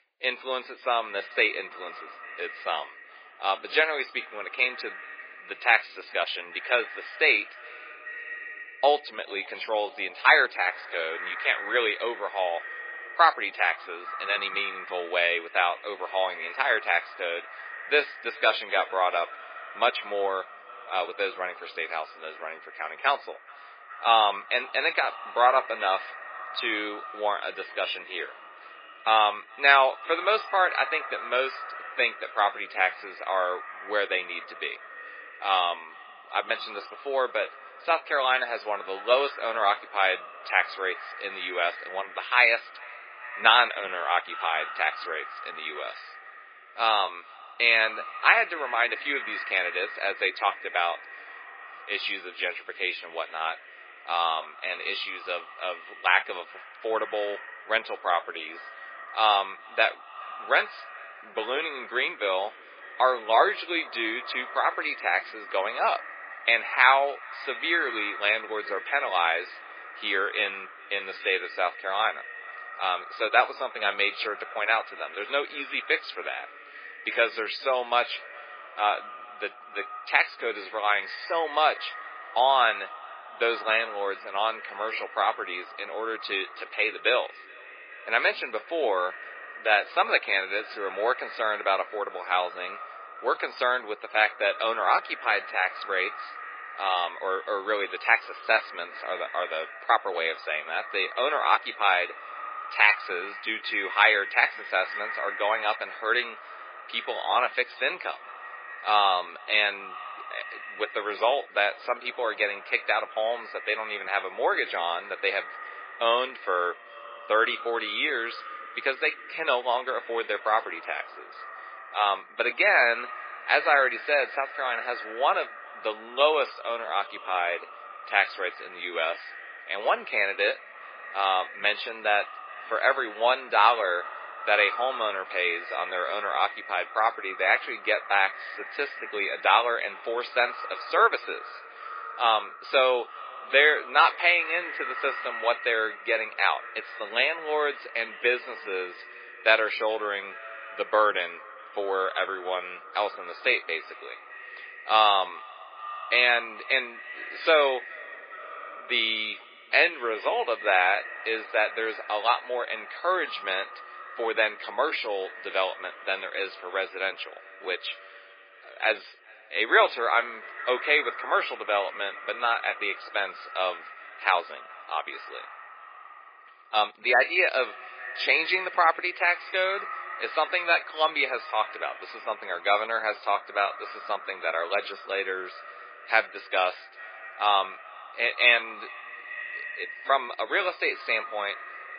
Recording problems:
garbled, watery; badly
thin; very; fading below 450 Hz
echo of what is said; noticeable; throughout; 420 ms later, 15 dB below the speech

